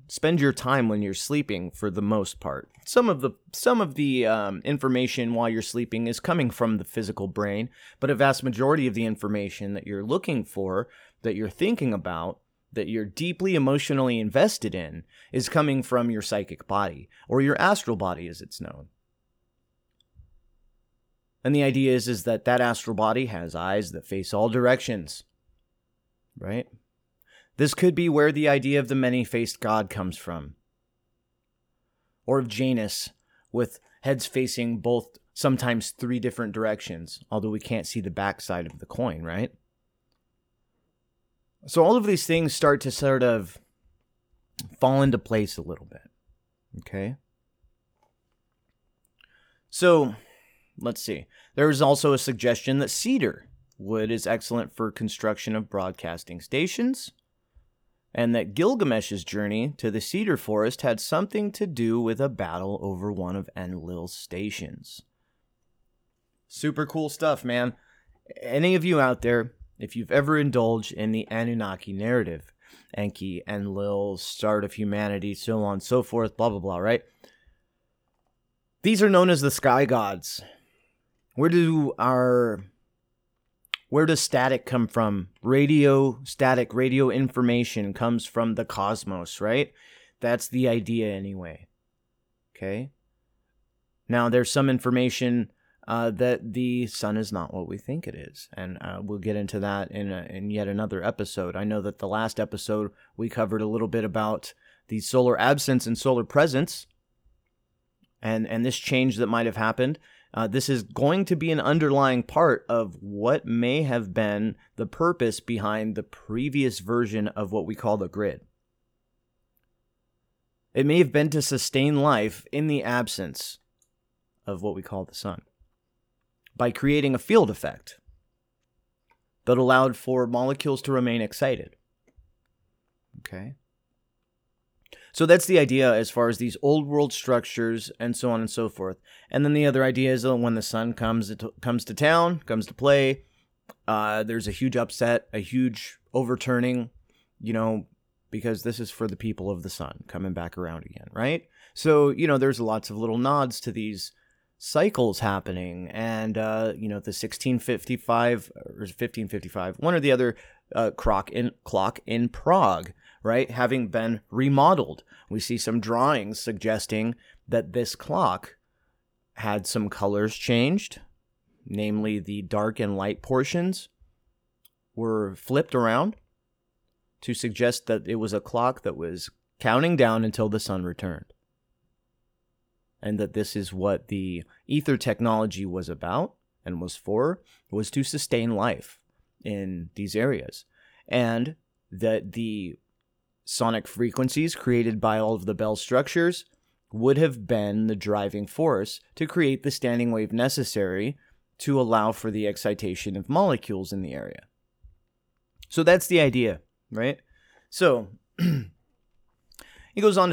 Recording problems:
abrupt cut into speech; at the end

